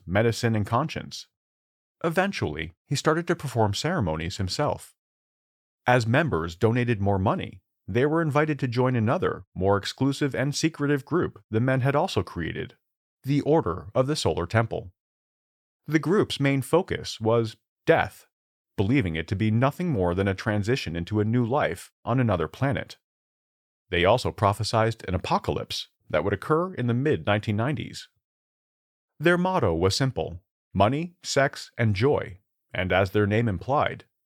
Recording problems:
none

